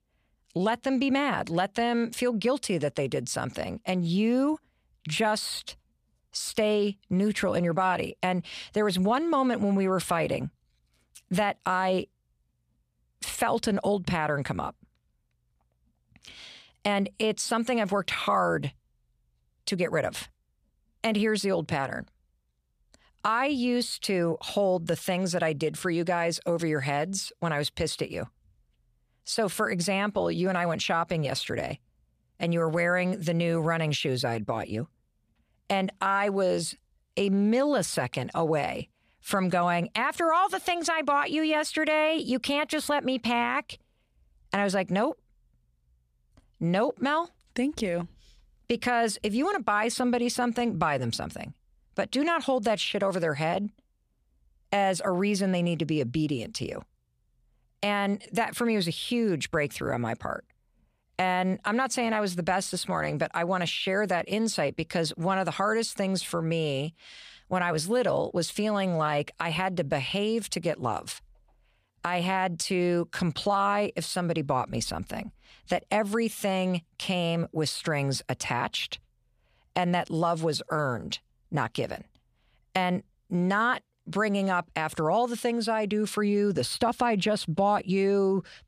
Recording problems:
none

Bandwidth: 14.5 kHz